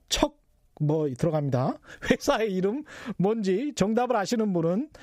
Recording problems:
squashed, flat; heavily

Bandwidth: 15.5 kHz